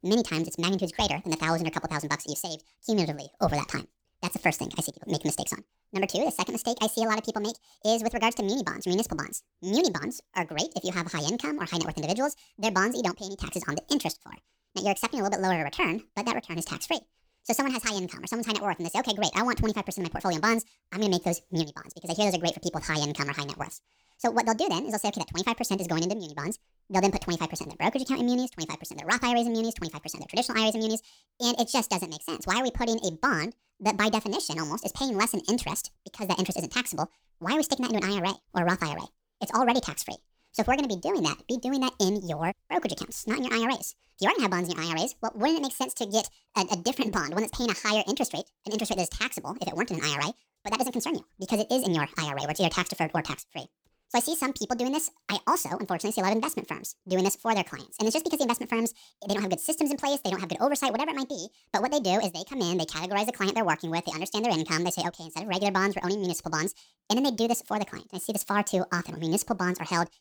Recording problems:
wrong speed and pitch; too fast and too high; 1.6 times normal speed

